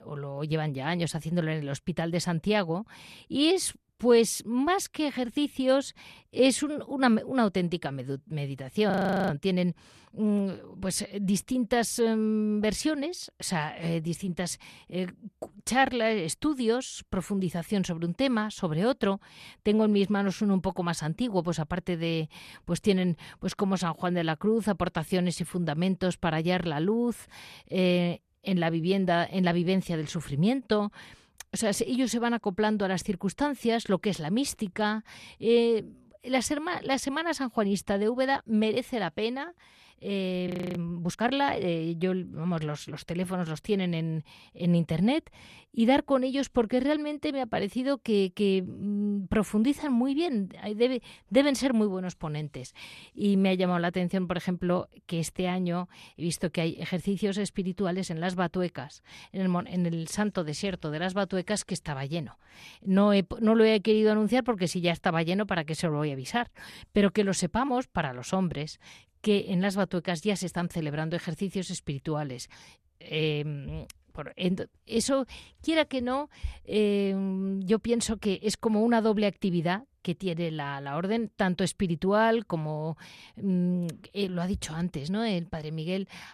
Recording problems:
audio freezing; at 9 s and at 40 s

